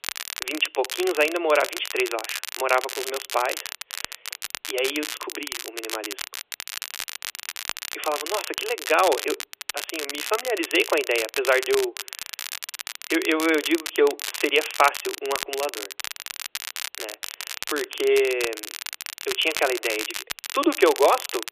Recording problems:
thin; very; fading below 350 Hz
phone-call audio; nothing above 3.5 kHz
crackle, like an old record; loud; 7 dB below the speech

